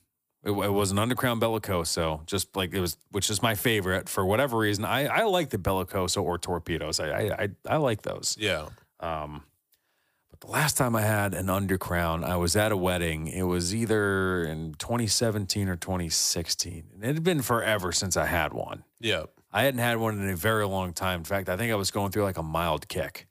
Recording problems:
none

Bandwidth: 15 kHz